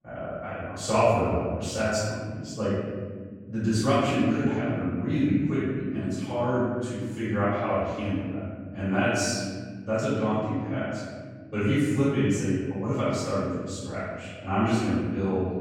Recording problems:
room echo; strong; dies away in 1.9 s
off-mic speech; far

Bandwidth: 16 kHz